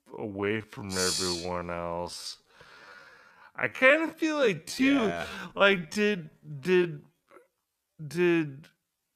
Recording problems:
wrong speed, natural pitch; too slow; 0.5 times normal speed

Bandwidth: 14.5 kHz